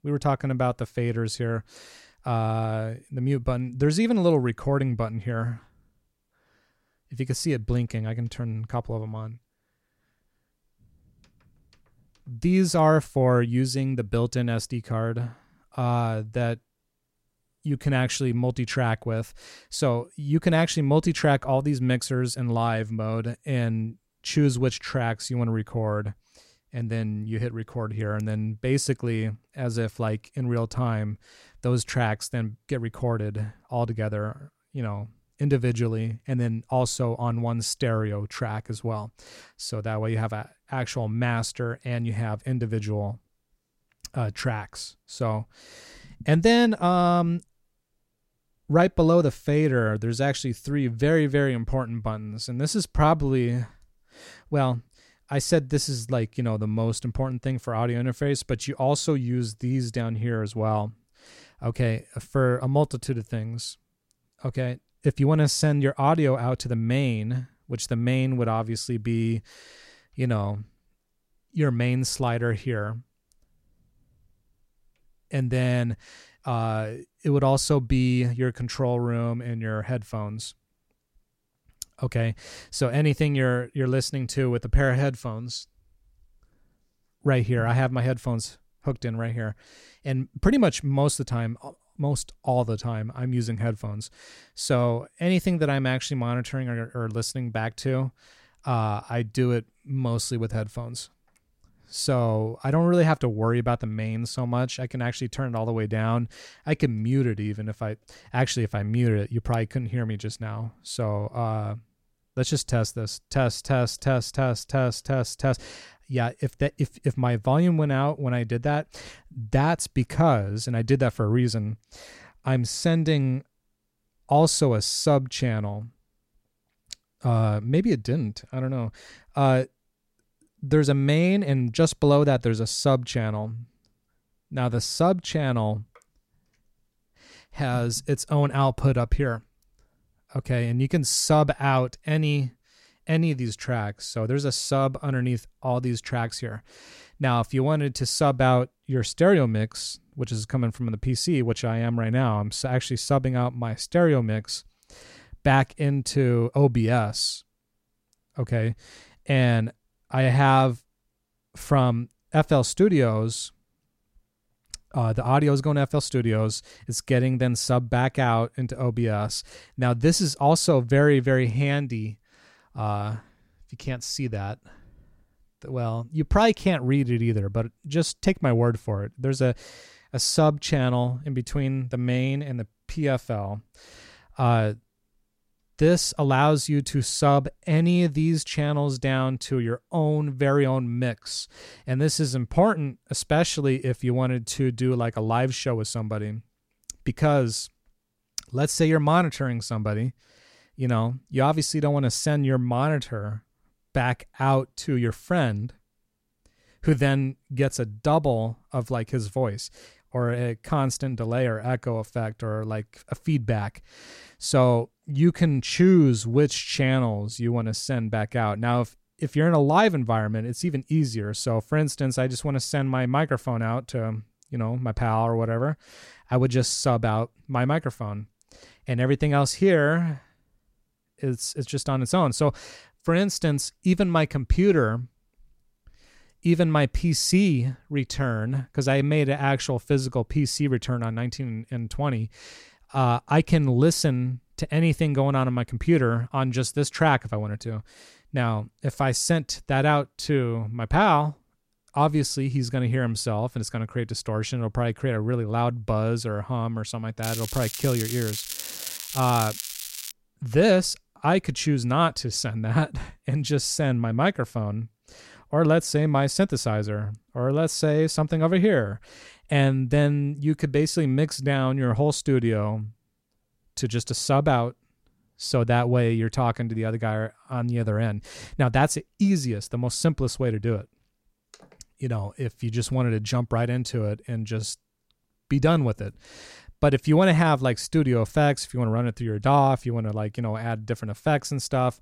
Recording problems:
crackling; loud; from 4:17 to 4:20; 8 dB below the speech

